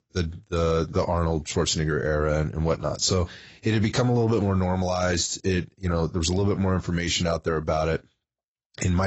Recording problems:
garbled, watery; badly; nothing above 8 kHz
abrupt cut into speech; at the end

